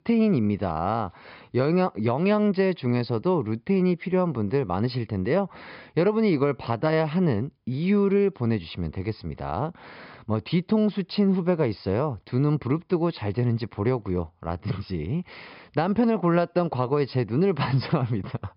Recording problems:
high frequencies cut off; noticeable; nothing above 5.5 kHz

